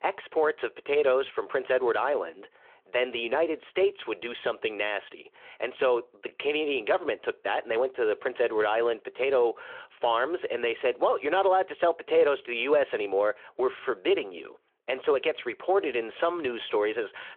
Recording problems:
phone-call audio

